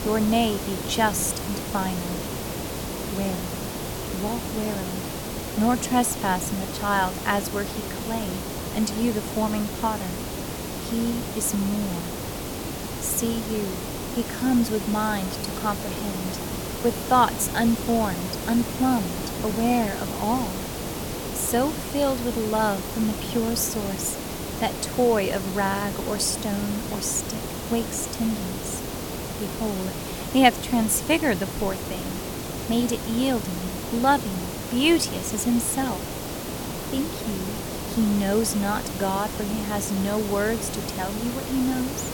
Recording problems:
hiss; loud; throughout; 5 dB below the speech

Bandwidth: 17.5 kHz